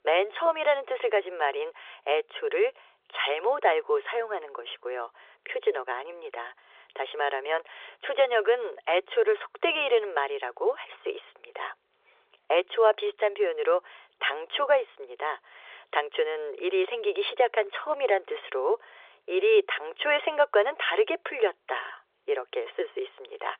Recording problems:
phone-call audio; nothing above 3.5 kHz

